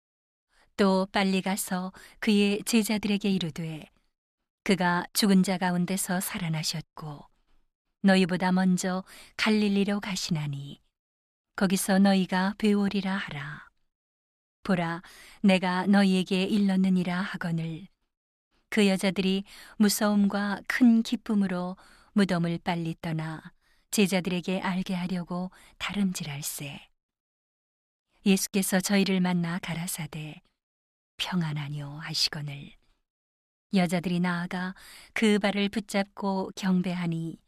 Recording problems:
none

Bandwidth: 14 kHz